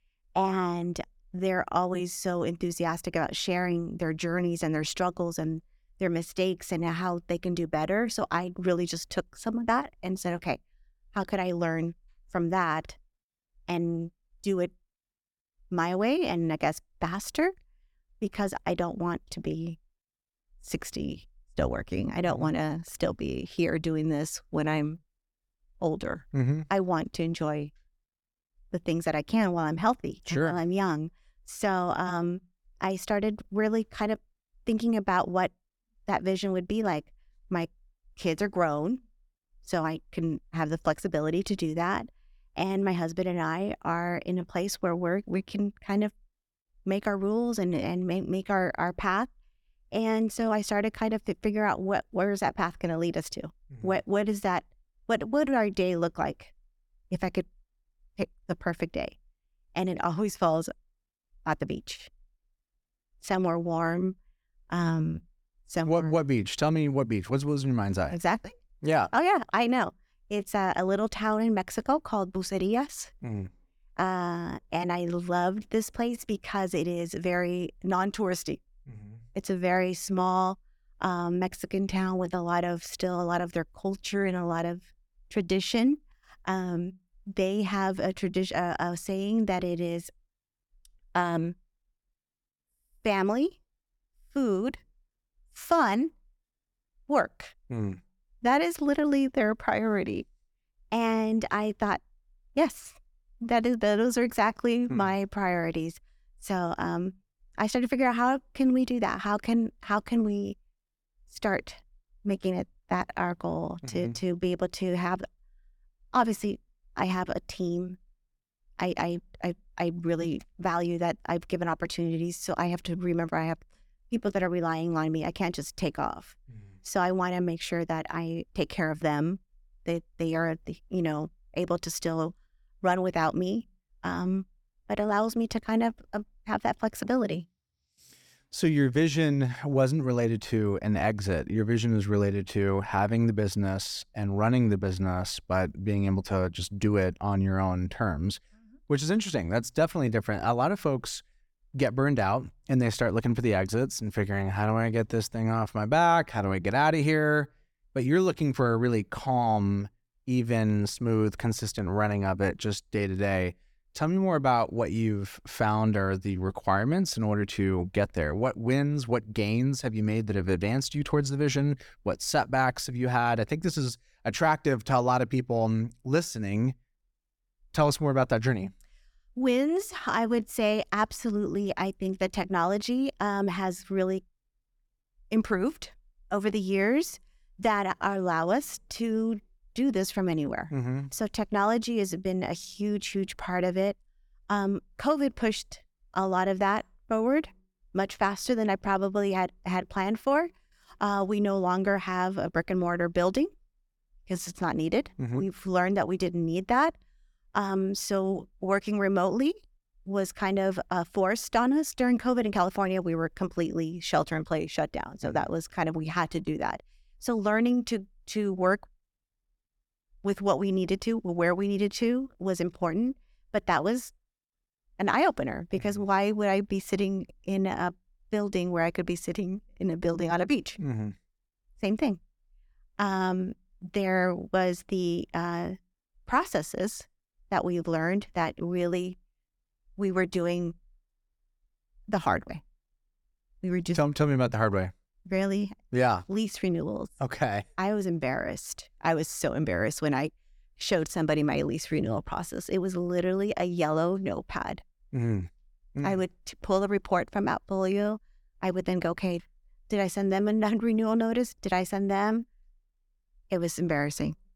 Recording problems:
none

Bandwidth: 18 kHz